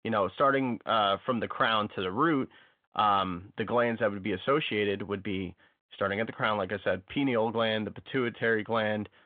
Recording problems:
phone-call audio; nothing above 3.5 kHz

